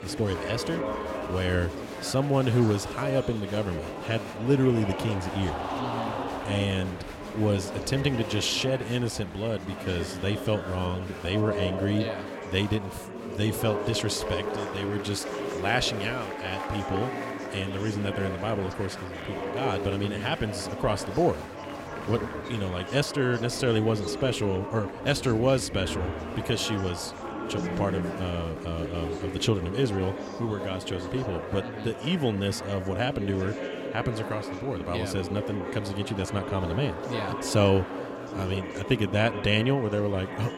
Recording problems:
chatter from many people; loud; throughout; 6 dB below the speech

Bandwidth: 16.5 kHz